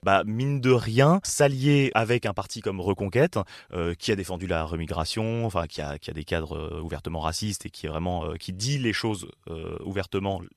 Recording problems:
none

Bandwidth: 13.5 kHz